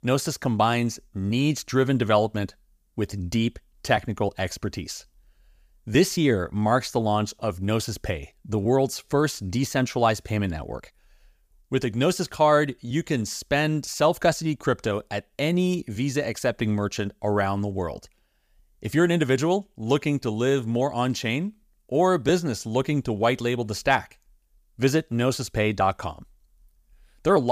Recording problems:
abrupt cut into speech; at the end

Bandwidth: 15 kHz